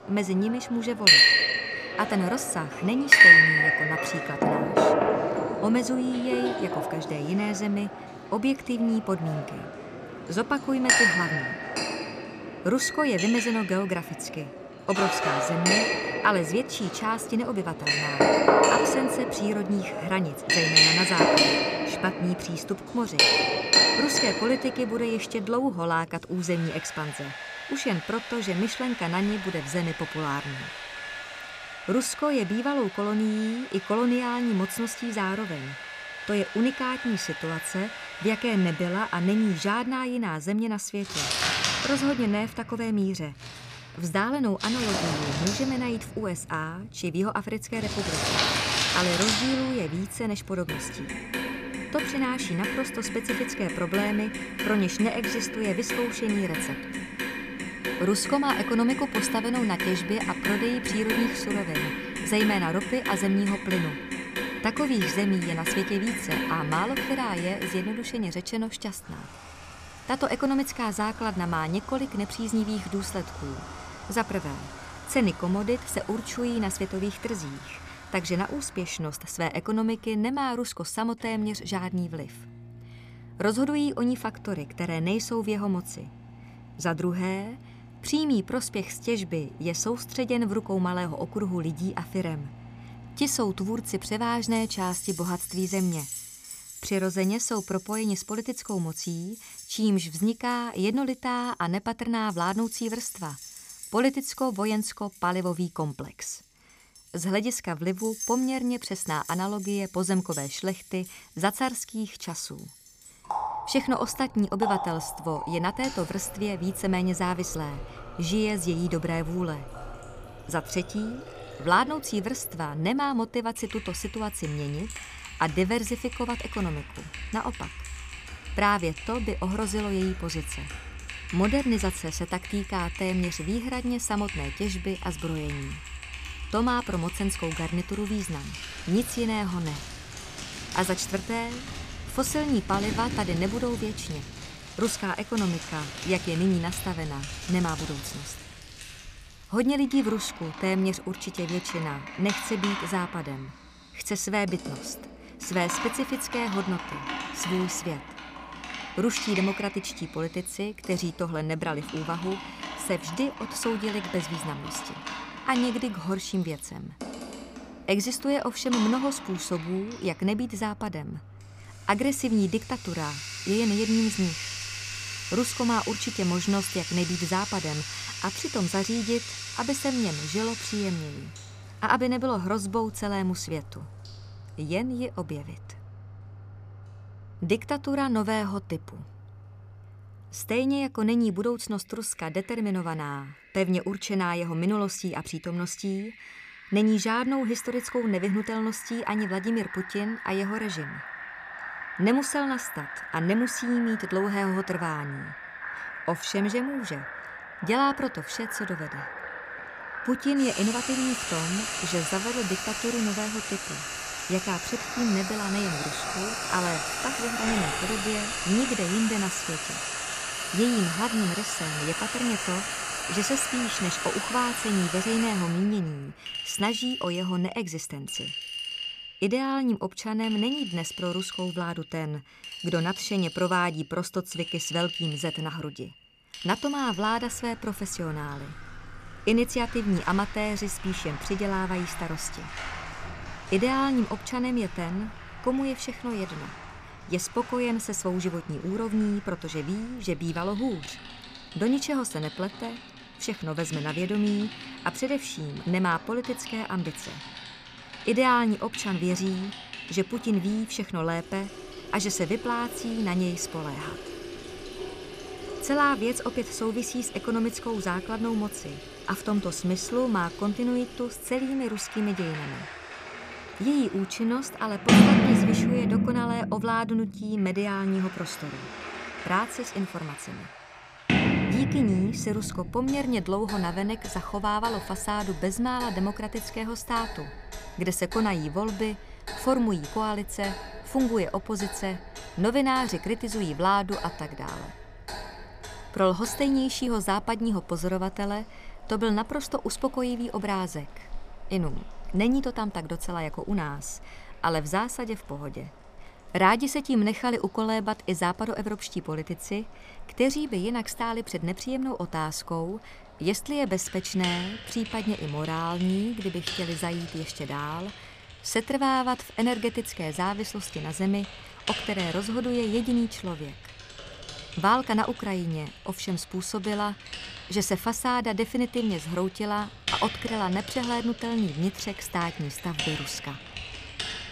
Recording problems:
household noises; loud; throughout; 1 dB below the speech

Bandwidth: 15 kHz